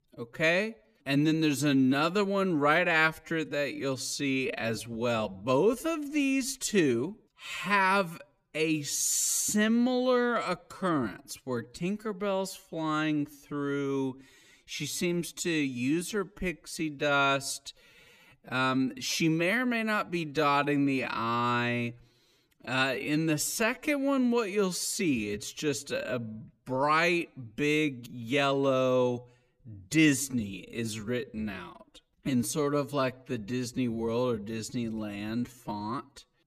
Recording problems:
wrong speed, natural pitch; too slow; 0.6 times normal speed

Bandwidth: 14.5 kHz